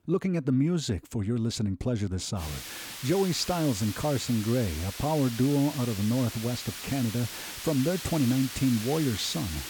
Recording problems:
hiss; loud; from 2.5 s on; 9 dB below the speech

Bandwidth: 18 kHz